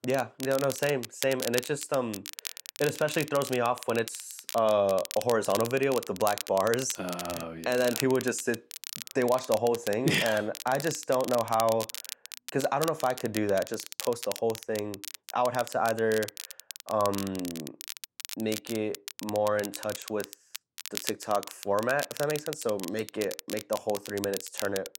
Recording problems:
crackle, like an old record; loud; 10 dB below the speech

